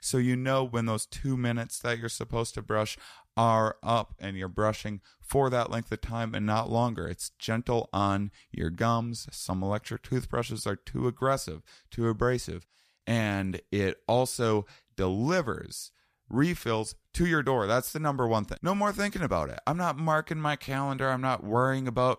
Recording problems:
none

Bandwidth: 14.5 kHz